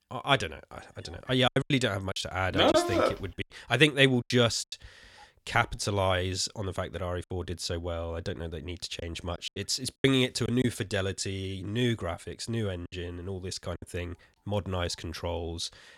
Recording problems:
choppy; very; 6% of the speech affected

